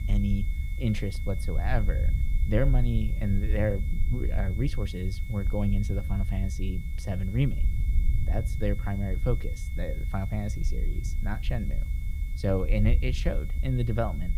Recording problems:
high-pitched whine; noticeable; throughout; 2 kHz, 20 dB below the speech
low rumble; noticeable; throughout; 15 dB below the speech
hiss; faint; throughout; 25 dB below the speech

